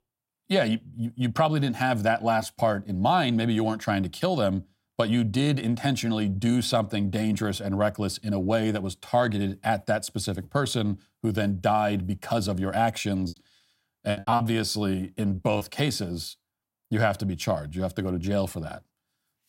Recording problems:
choppy; very; from 13 to 16 s; 12% of the speech affected

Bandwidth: 16 kHz